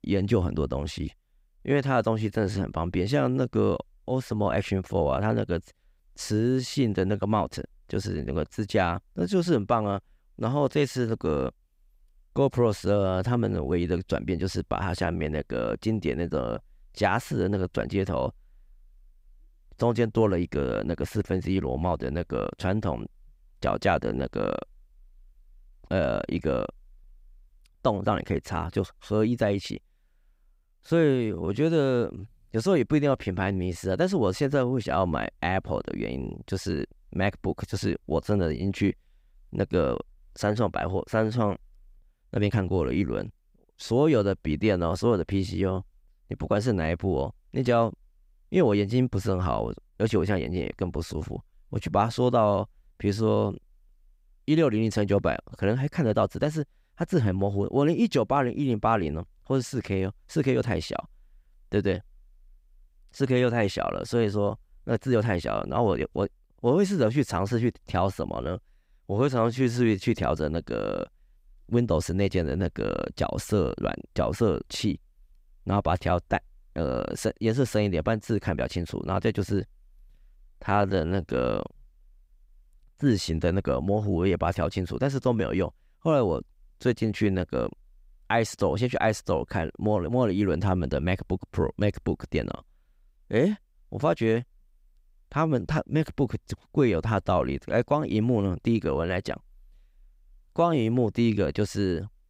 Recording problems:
uneven, jittery; strongly; from 31 s to 1:21

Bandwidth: 15.5 kHz